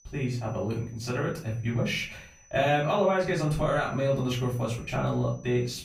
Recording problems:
off-mic speech; far
room echo; slight; dies away in 0.4 s
high-pitched whine; faint; throughout; 6 kHz, 30 dB below the speech

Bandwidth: 15.5 kHz